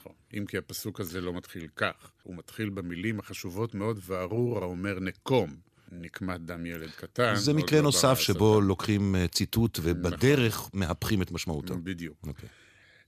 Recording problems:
none

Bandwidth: 14.5 kHz